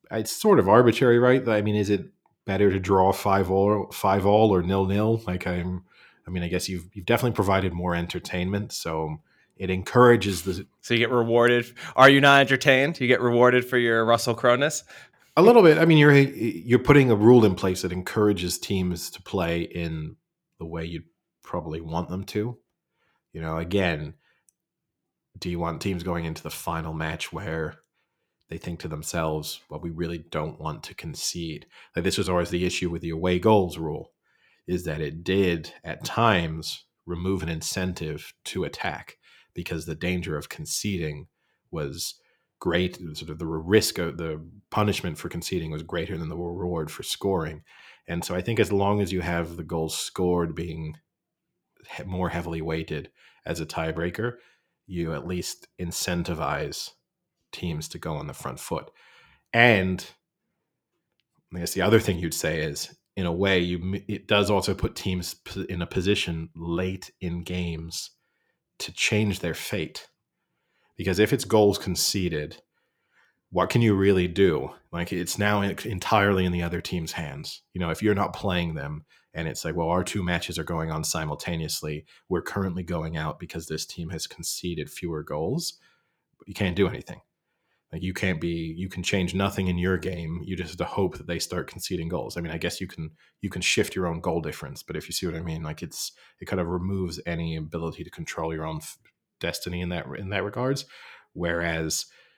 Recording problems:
none

